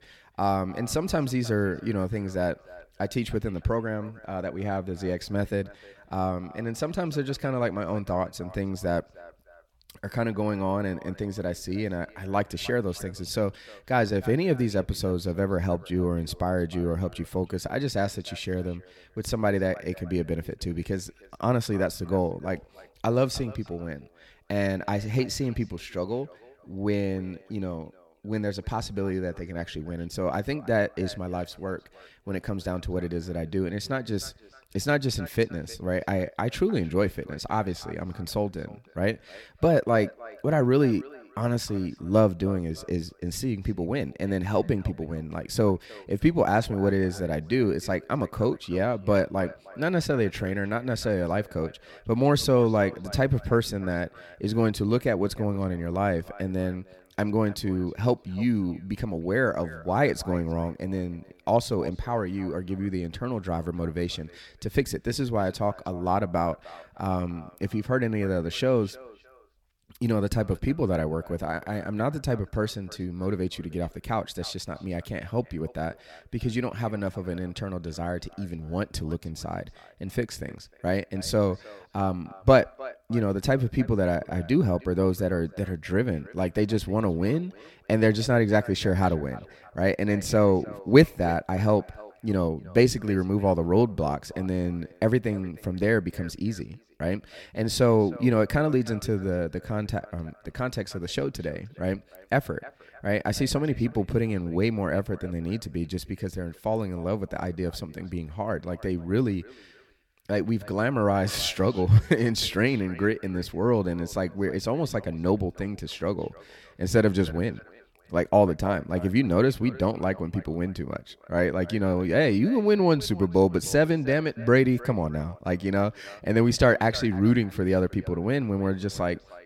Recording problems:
echo of what is said; faint; throughout; 310 ms later, 20 dB below the speech

